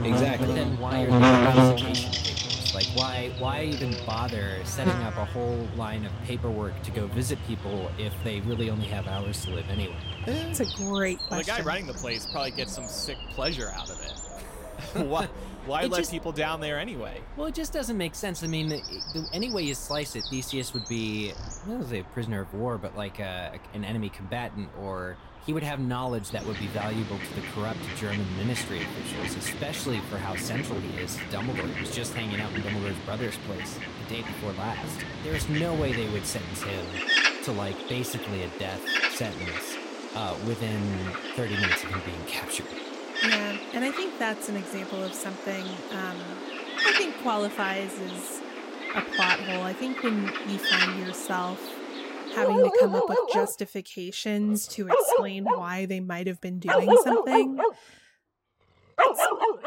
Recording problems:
animal sounds; very loud; throughout; 4 dB above the speech

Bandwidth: 16 kHz